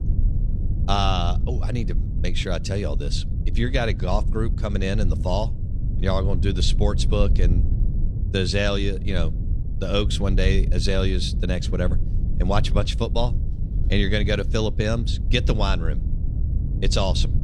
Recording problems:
low rumble; noticeable; throughout; 15 dB below the speech

